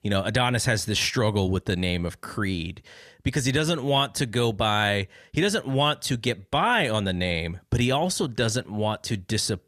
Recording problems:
none

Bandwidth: 14.5 kHz